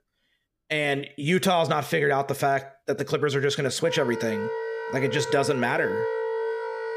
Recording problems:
background music; loud; throughout; 5 dB below the speech

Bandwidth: 15 kHz